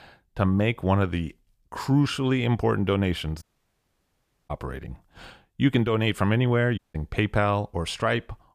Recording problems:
audio cutting out; at 3.5 s for 1 s and at 7 s

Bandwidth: 15 kHz